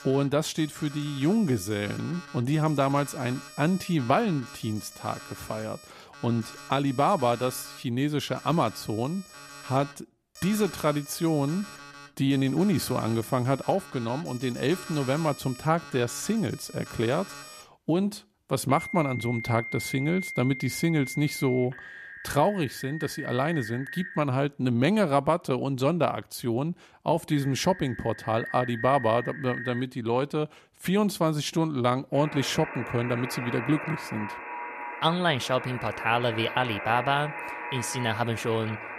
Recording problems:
alarms or sirens; noticeable; throughout; 10 dB below the speech

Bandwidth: 14.5 kHz